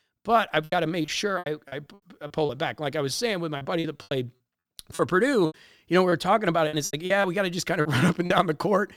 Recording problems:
choppy; very; 13% of the speech affected

